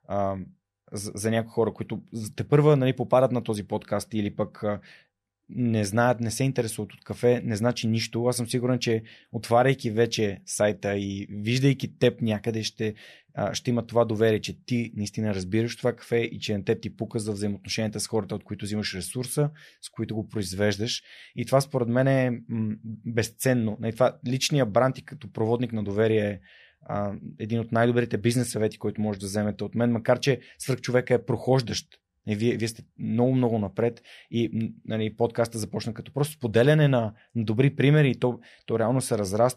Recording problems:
none

